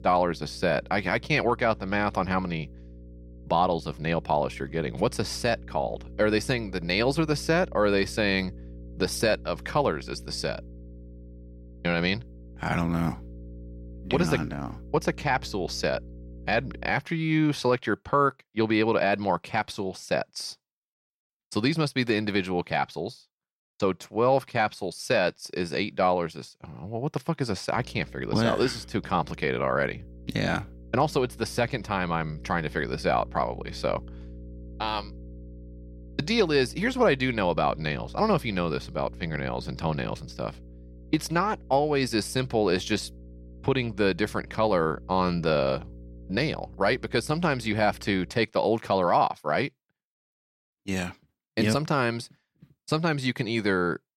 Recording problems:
electrical hum; faint; until 17 s and from 28 to 48 s; 60 Hz, 25 dB below the speech

